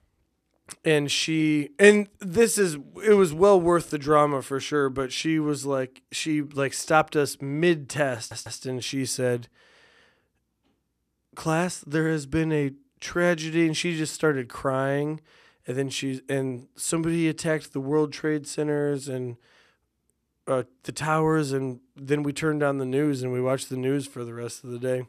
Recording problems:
audio stuttering; at 8 s

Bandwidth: 14 kHz